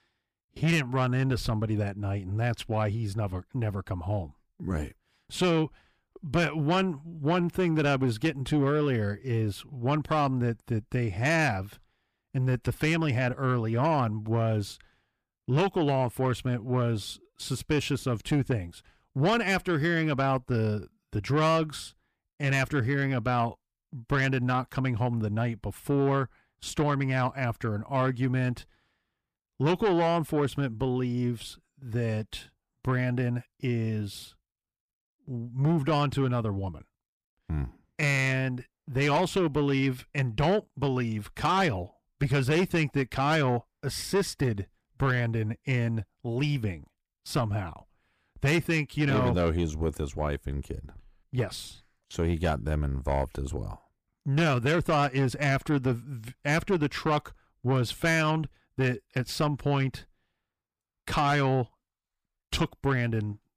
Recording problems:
distortion; slight; 10 dB below the speech

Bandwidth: 15 kHz